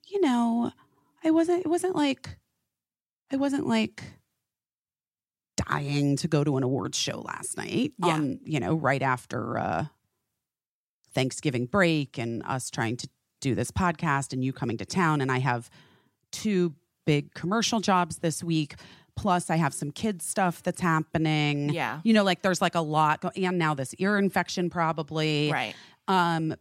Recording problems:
none

